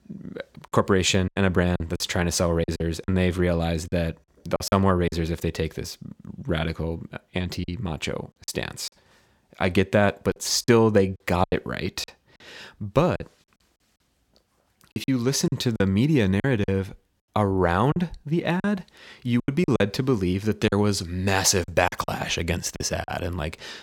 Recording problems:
choppy; very; 8% of the speech affected

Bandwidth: 17 kHz